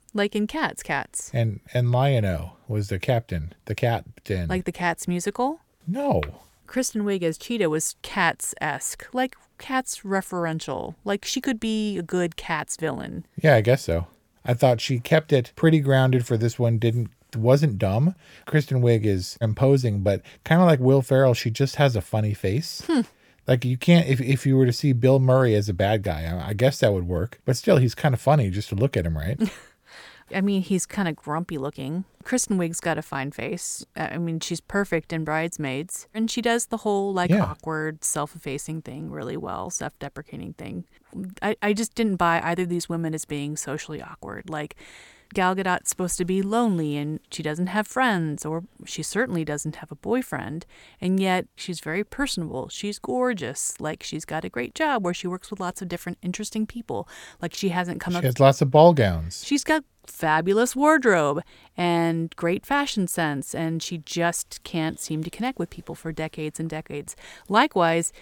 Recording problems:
none

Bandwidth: 17.5 kHz